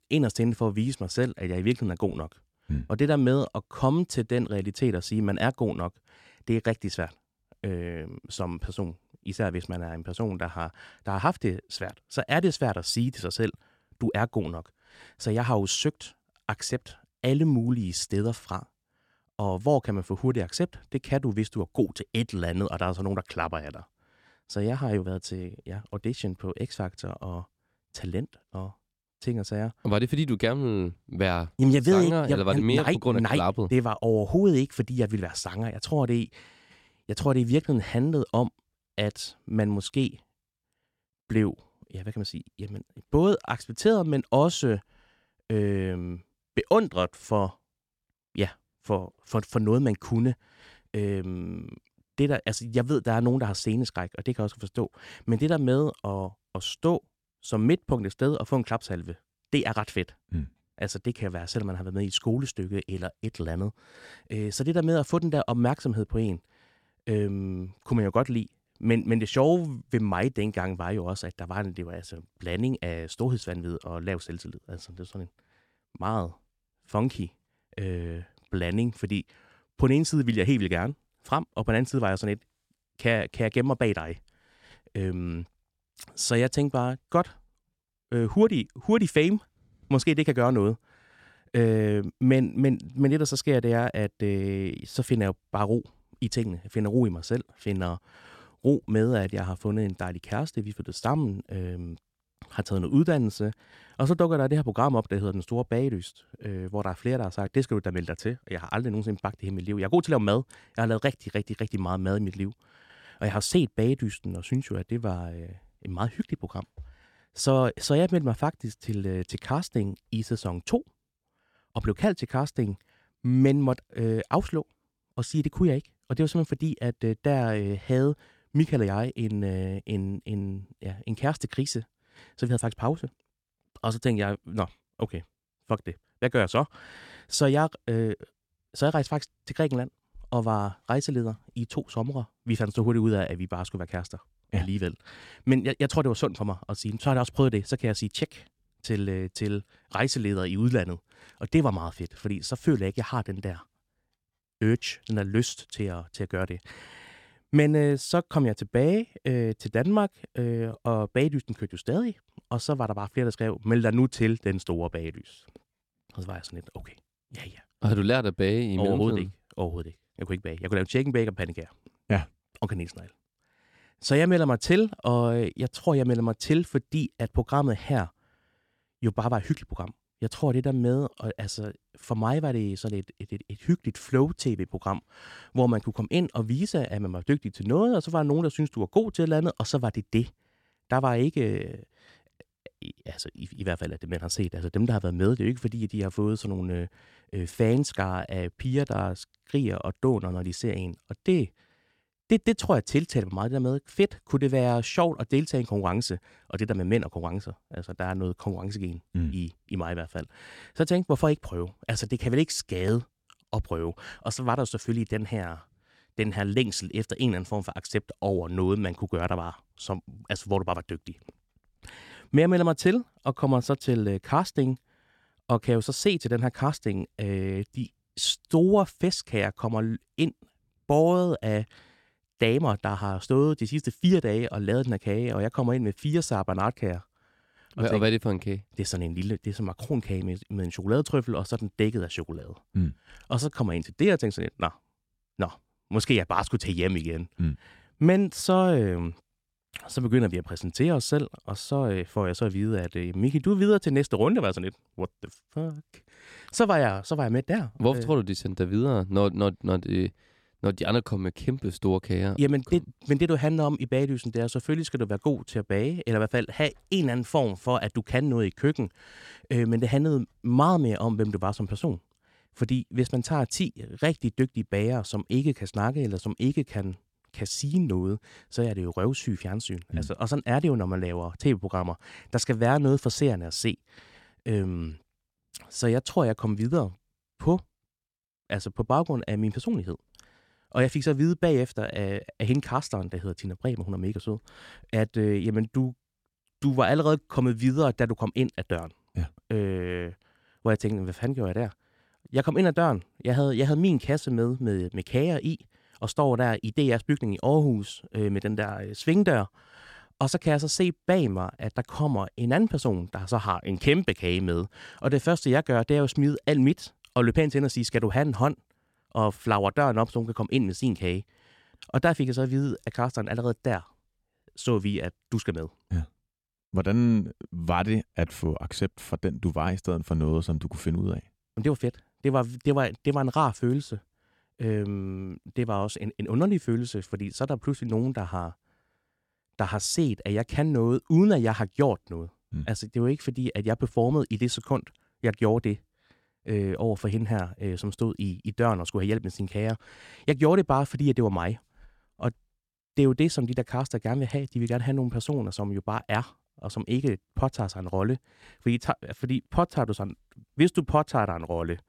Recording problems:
none

